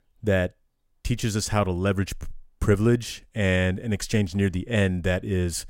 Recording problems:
none

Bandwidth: 16 kHz